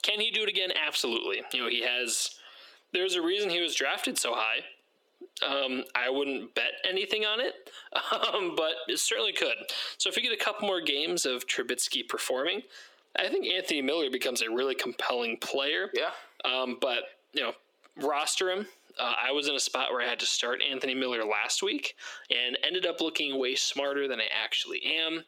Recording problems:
squashed, flat; heavily
thin; somewhat; fading below 350 Hz

